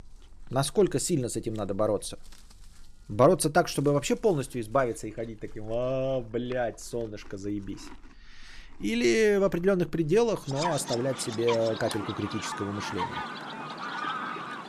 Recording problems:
animal sounds; loud; throughout; 8 dB below the speech

